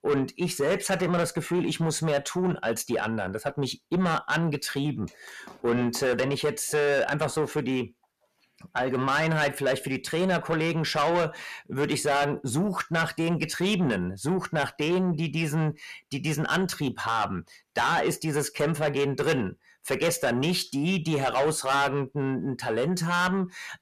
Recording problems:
distortion; heavy; 7 dB below the speech

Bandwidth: 14.5 kHz